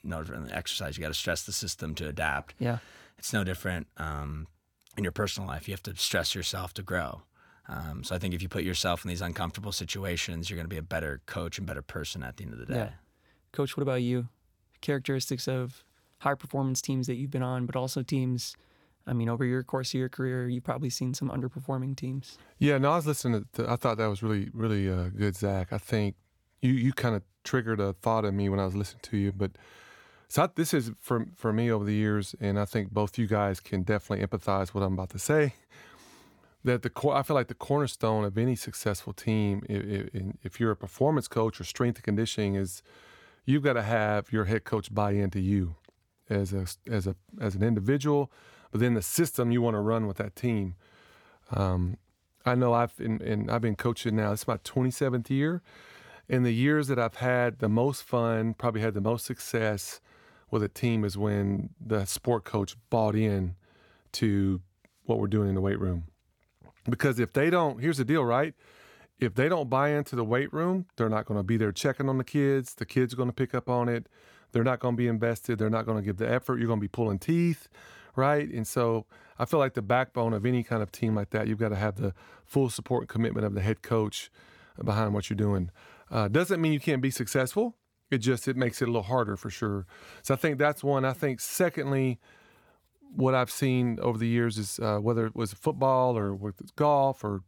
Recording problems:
none

